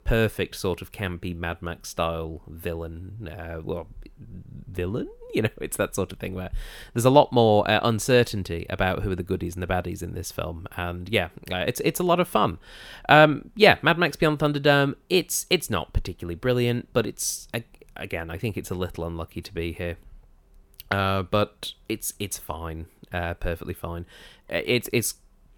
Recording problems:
none

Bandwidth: 18.5 kHz